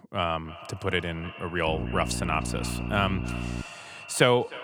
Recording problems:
echo of what is said; noticeable; throughout; 310 ms later, 15 dB below the speech
electrical hum; noticeable; from 1.5 to 3.5 s; 60 Hz, 15 dB below the speech

